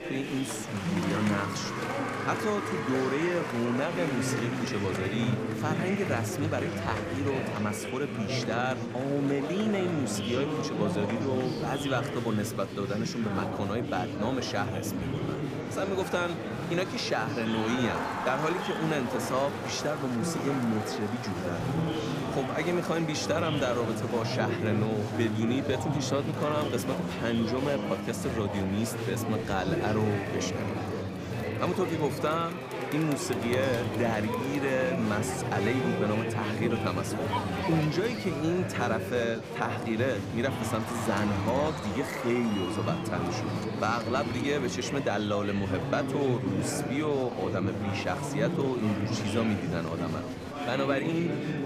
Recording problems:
murmuring crowd; loud; throughout; 2 dB below the speech

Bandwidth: 15 kHz